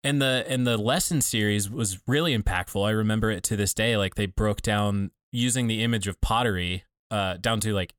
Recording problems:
none

